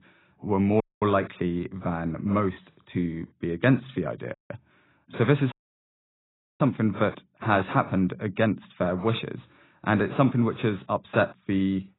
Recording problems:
garbled, watery; badly; nothing above 4 kHz
audio cutting out; at 1 s, at 4.5 s and at 5.5 s for 1 s

